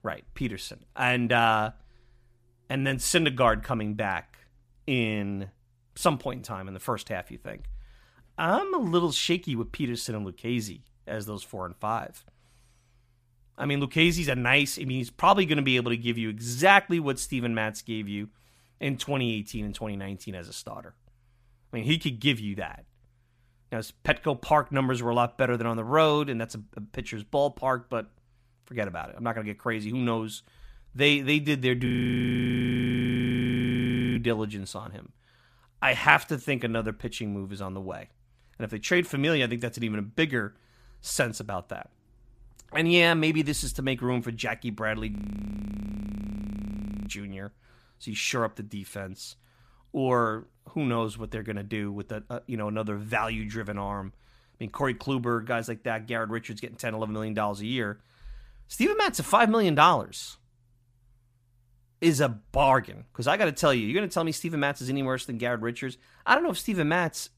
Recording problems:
audio freezing; at 32 s for 2.5 s and at 45 s for 2 s

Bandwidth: 15 kHz